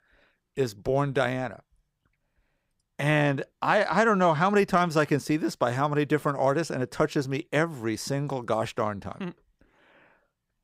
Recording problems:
none

